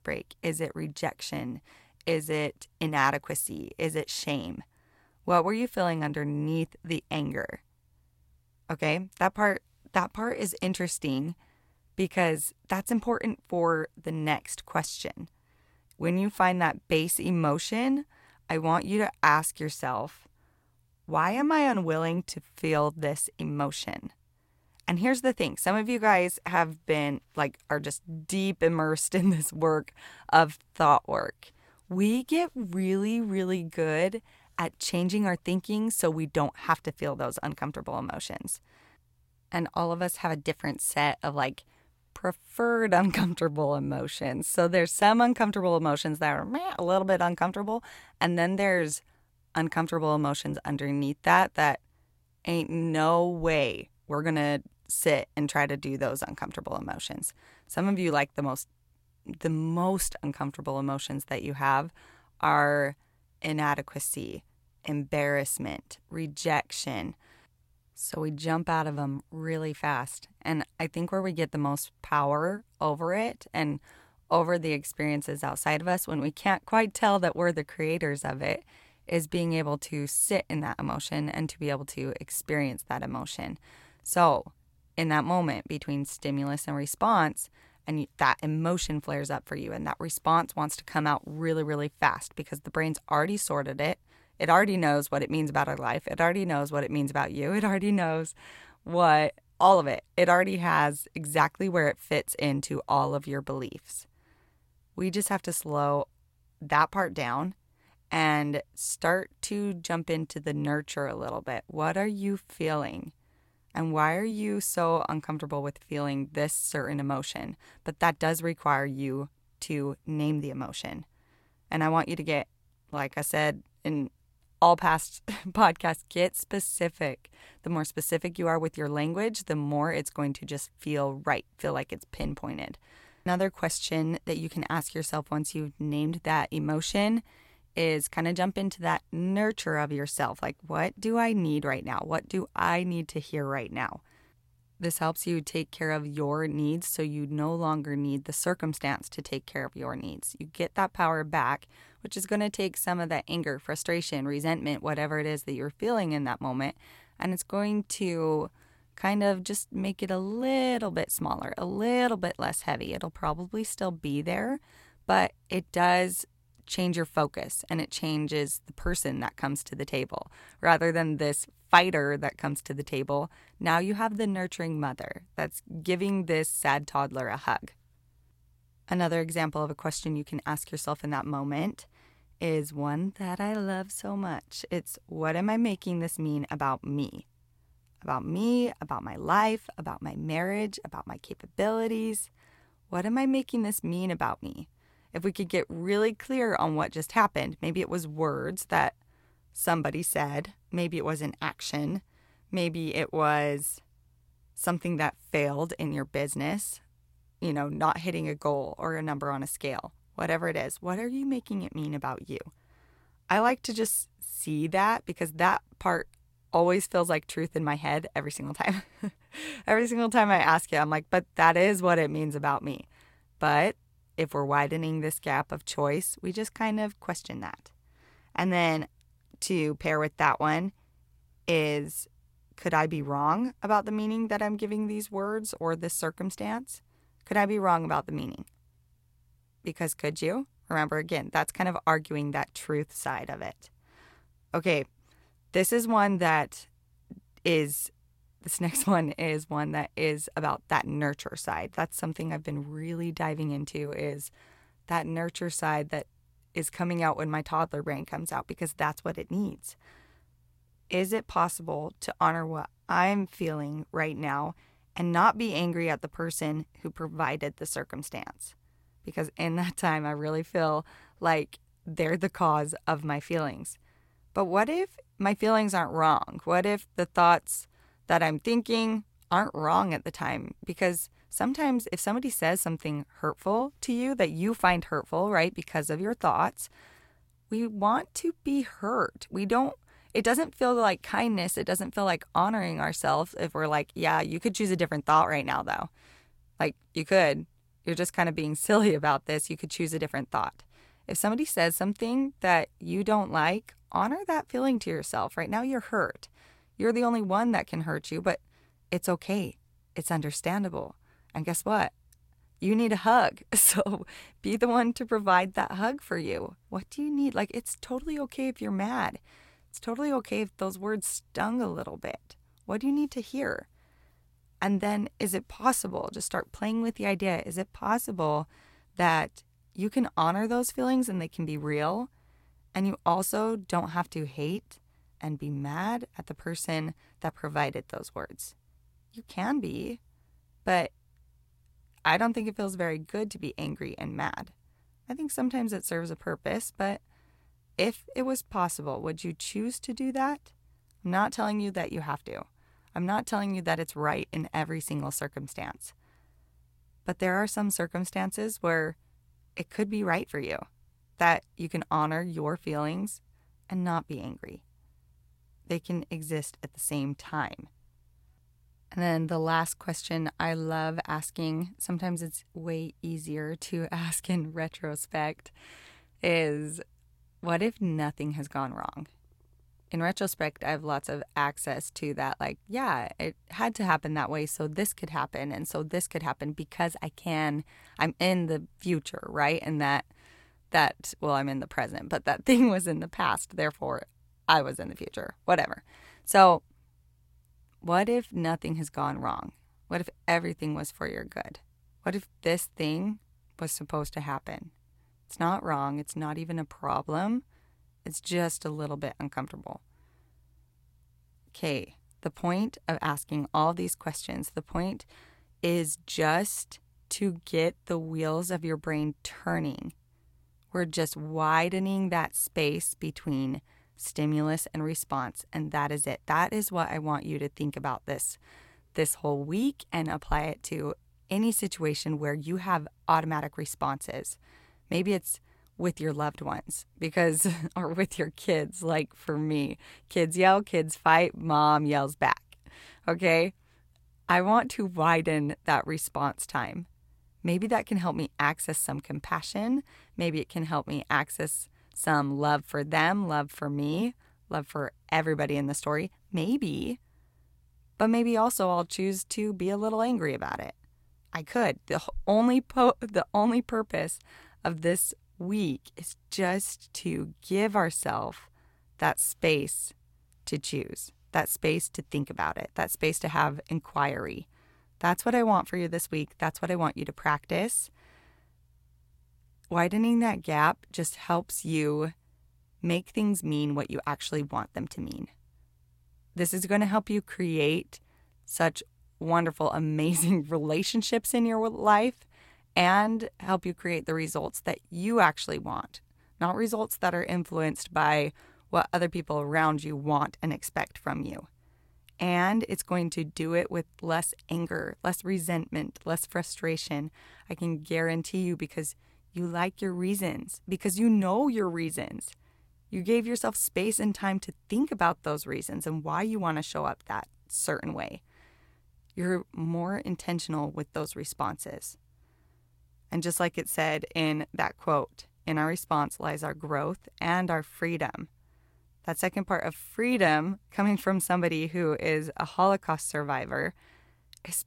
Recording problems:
none

